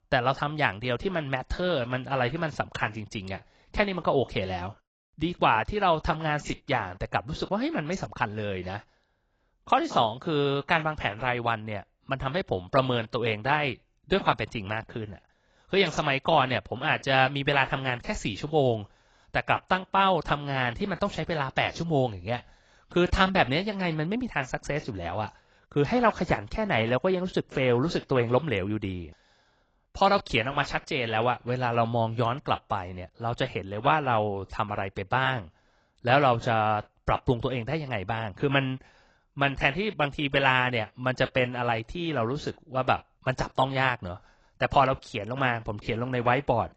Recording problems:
garbled, watery; badly; nothing above 7.5 kHz

